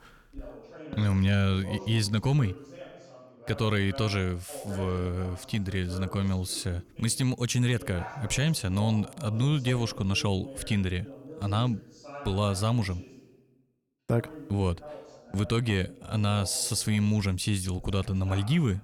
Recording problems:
voice in the background; noticeable; throughout; 15 dB below the speech

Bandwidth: 18.5 kHz